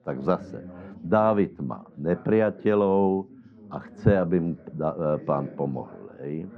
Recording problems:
muffled; very; fading above 1 kHz
chatter from many people; faint; throughout; 20 dB below the speech

